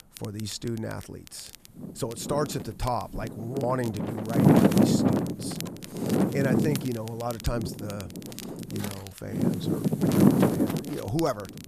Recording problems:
wind noise on the microphone; heavy; 4 dB above the speech
crackle, like an old record; noticeable; 15 dB below the speech

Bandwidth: 14.5 kHz